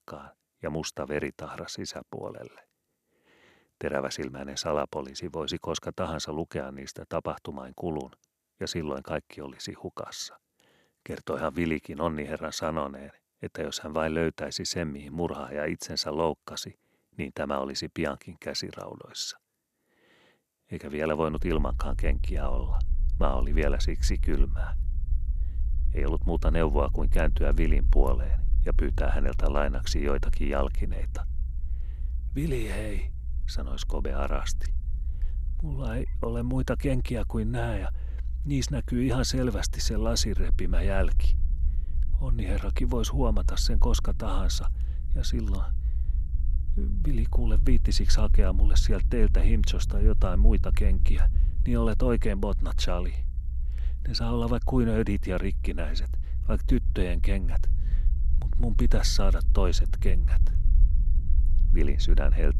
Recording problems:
low rumble; noticeable; from 21 s on; 20 dB below the speech

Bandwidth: 13.5 kHz